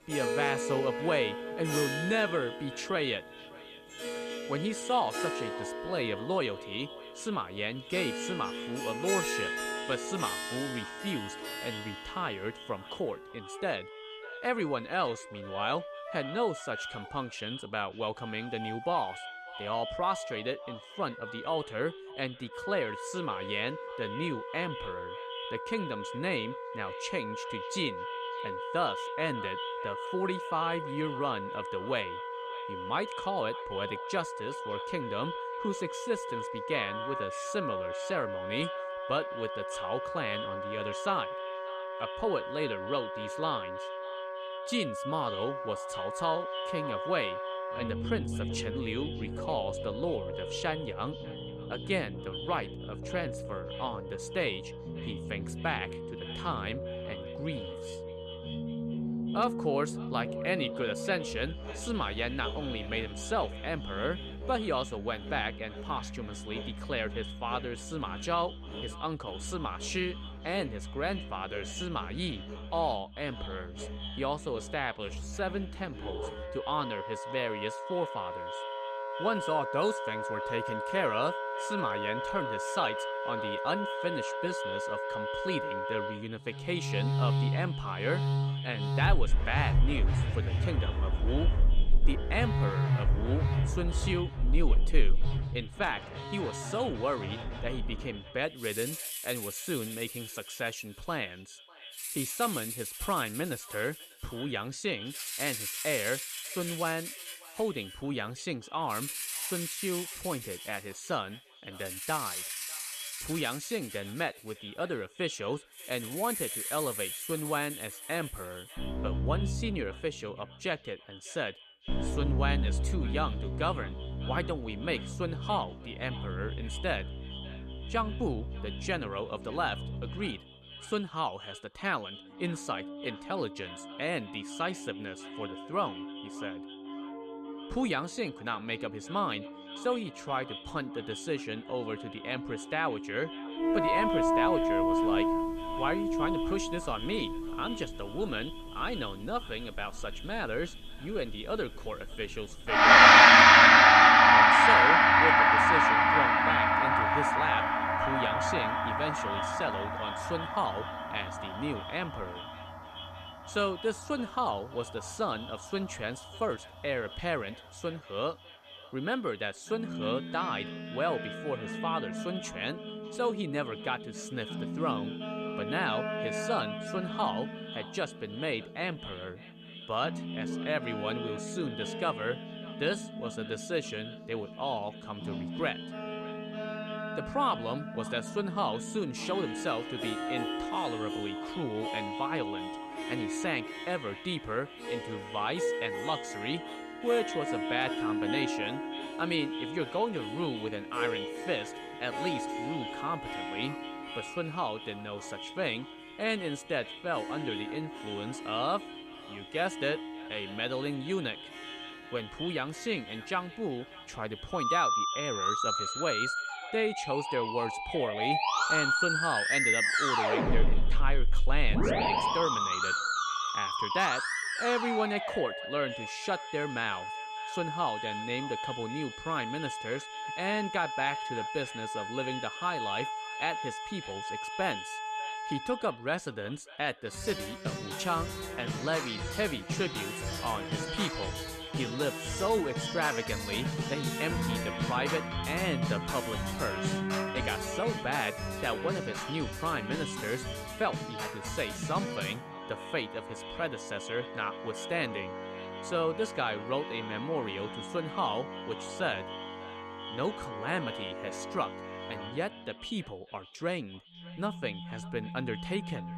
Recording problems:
echo of what is said; noticeable; throughout; 600 ms later, 15 dB below the speech
background music; very loud; throughout; 4 dB above the speech

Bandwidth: 14 kHz